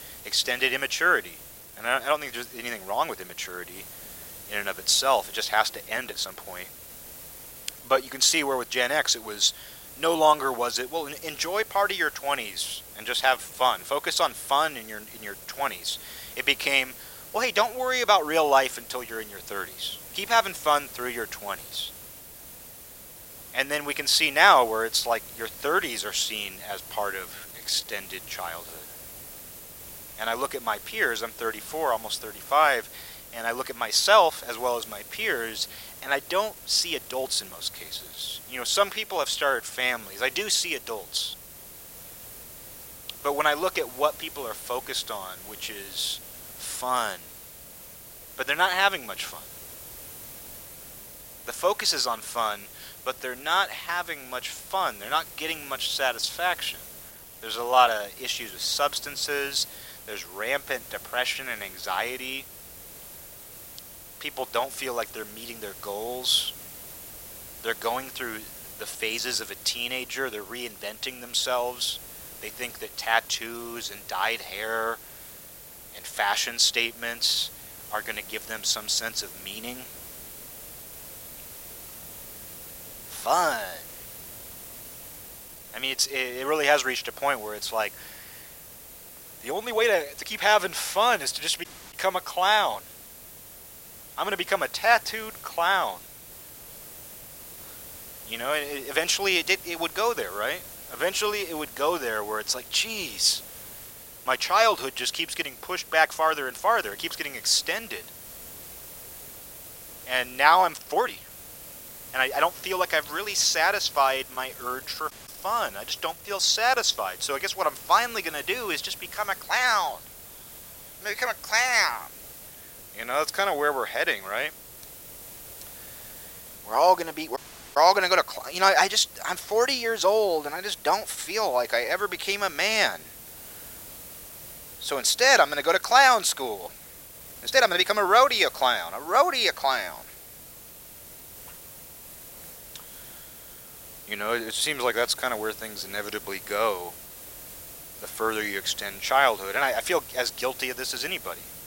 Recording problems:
thin; very; fading below 800 Hz
hiss; noticeable; throughout; 15 dB below the speech
uneven, jittery; strongly; from 1.5 s to 2:25
audio cutting out; at 1:32, at 1:55 and at 2:07

